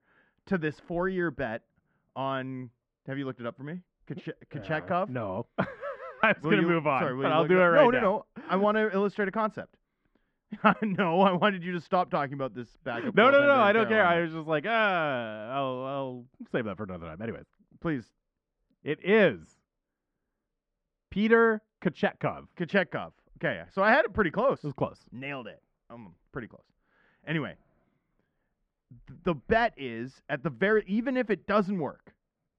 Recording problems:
muffled; very; fading above 1.5 kHz

